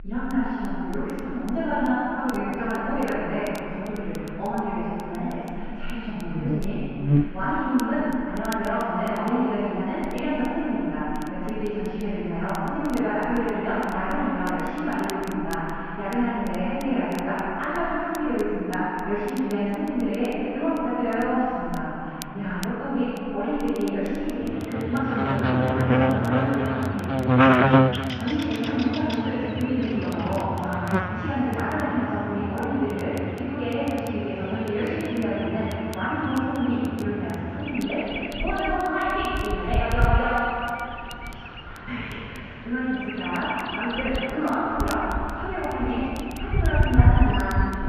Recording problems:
room echo; strong; dies away in 2.5 s
off-mic speech; far
muffled; very; fading above 2.5 kHz
wrong speed, natural pitch; too fast; 1.5 times normal speed
animal sounds; loud; throughout; as loud as the speech
crackle, like an old record; very faint; 20 dB below the speech

